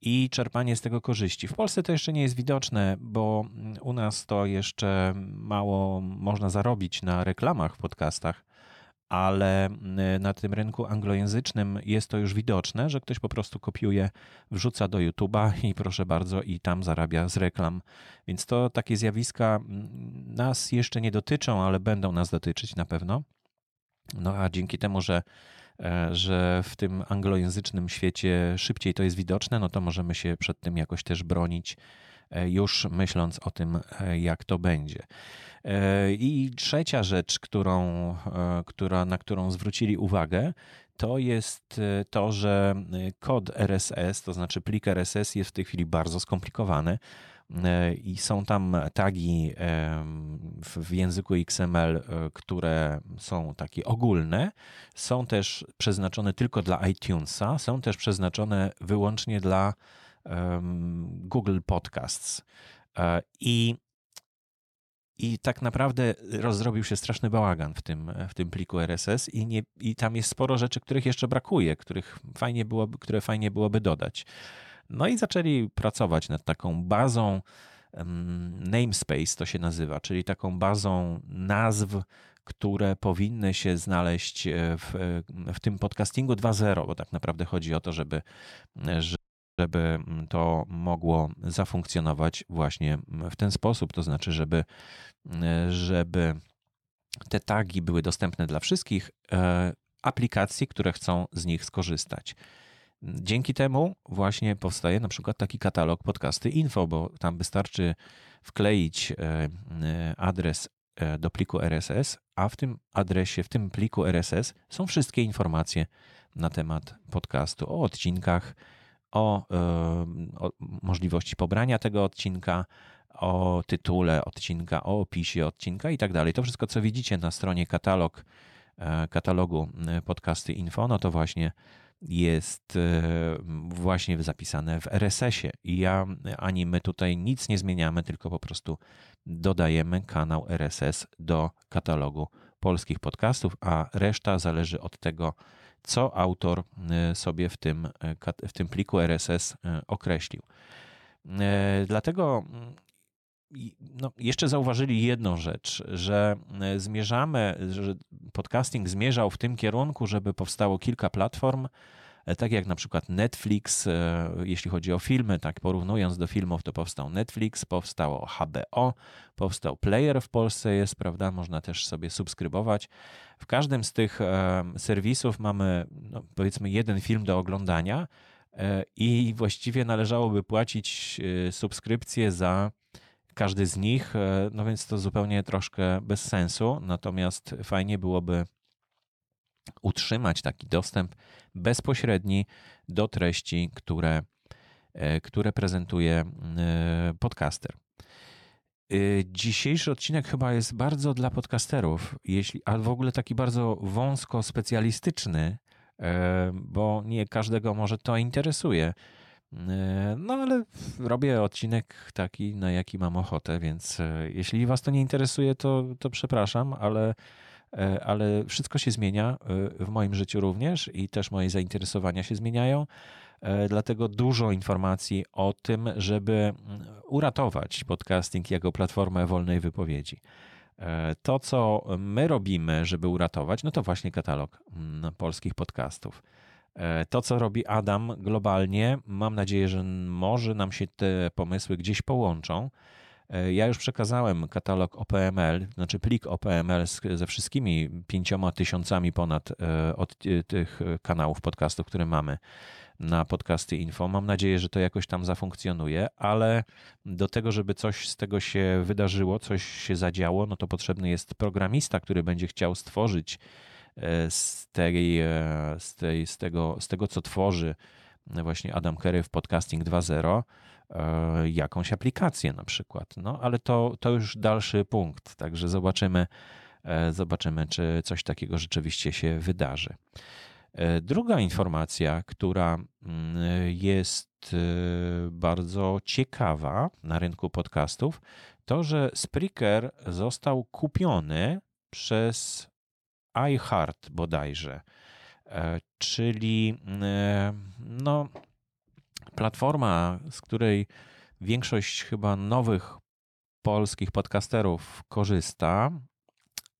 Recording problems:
audio freezing; at 1:29

